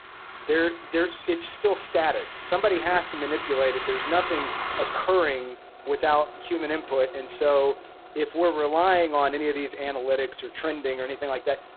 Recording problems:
phone-call audio; poor line; nothing above 4 kHz
traffic noise; loud; throughout; 10 dB below the speech

